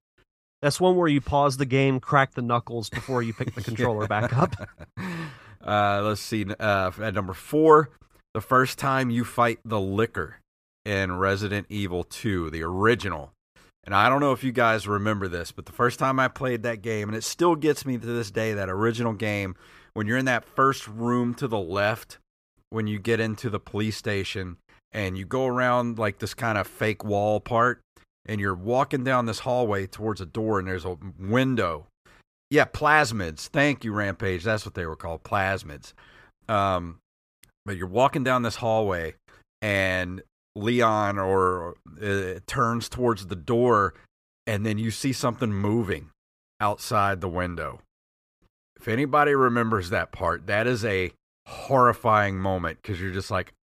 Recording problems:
none

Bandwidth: 15 kHz